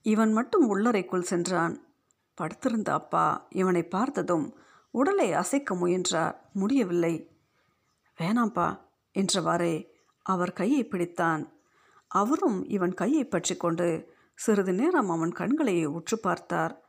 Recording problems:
none

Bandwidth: 15 kHz